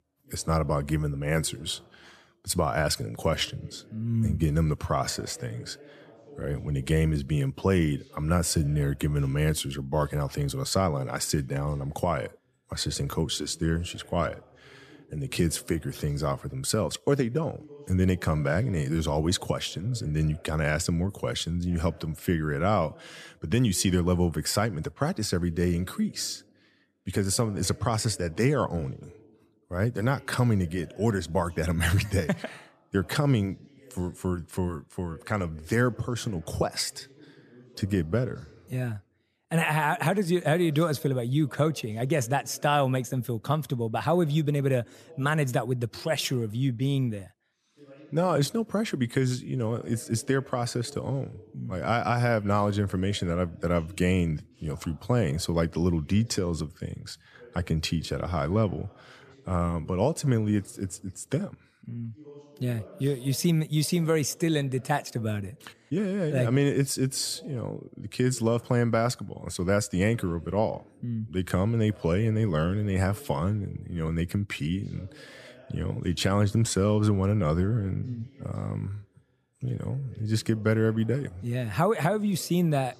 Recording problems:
voice in the background; faint; throughout; 25 dB below the speech

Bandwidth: 14.5 kHz